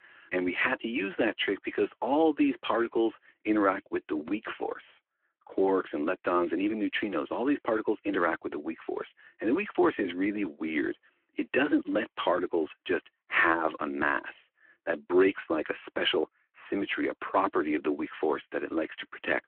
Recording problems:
phone-call audio

